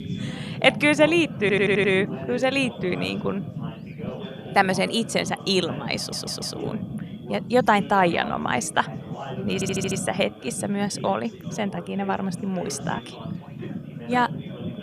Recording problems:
background chatter; noticeable; throughout; 4 voices, 15 dB below the speech
low rumble; noticeable; throughout; 20 dB below the speech
audio stuttering; at 1.5 s, at 6 s and at 9.5 s

